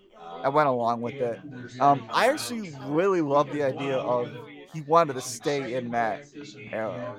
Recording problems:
background chatter; noticeable; throughout; 4 voices, 15 dB below the speech

